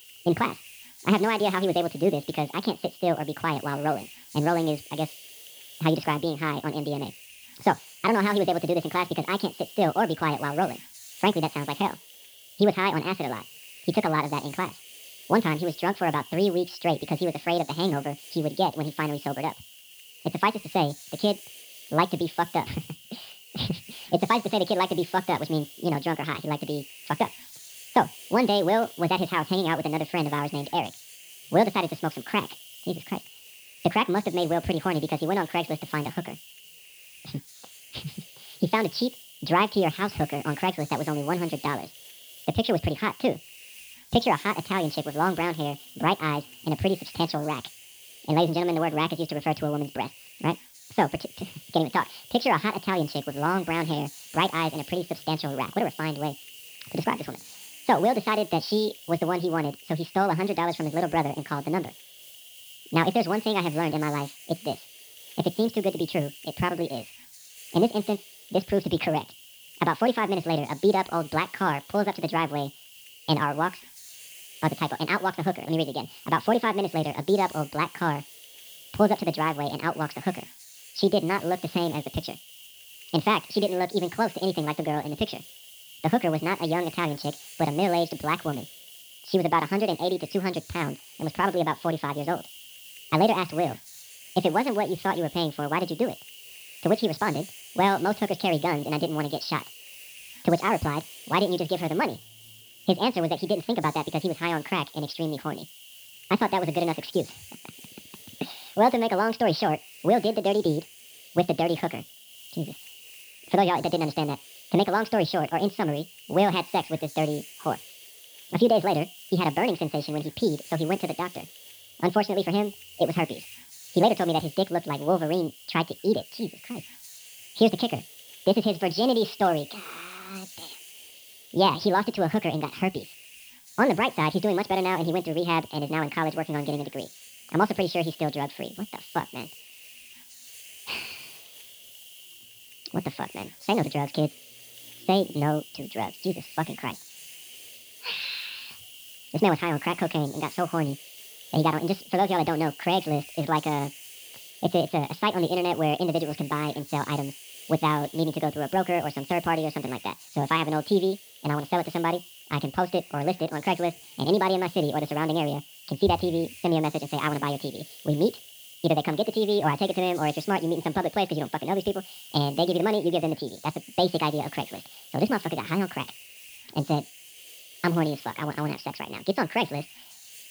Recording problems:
wrong speed and pitch; too fast and too high; 1.6 times normal speed
high frequencies cut off; noticeable; nothing above 5.5 kHz
hiss; noticeable; throughout; 15 dB below the speech

